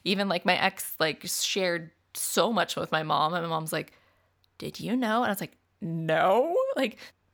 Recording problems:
none

